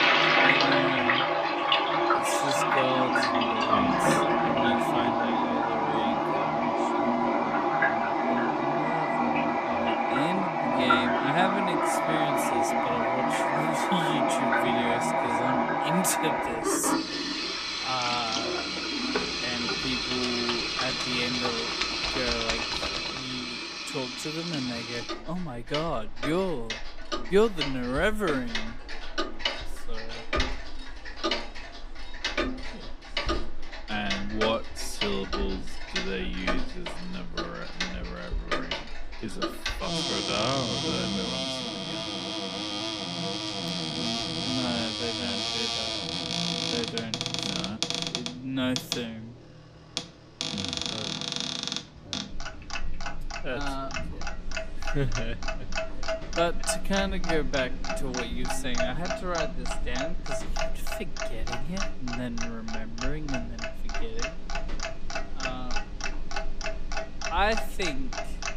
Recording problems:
wrong speed, natural pitch; too slow; 0.6 times normal speed
household noises; very loud; throughout; 5 dB above the speech

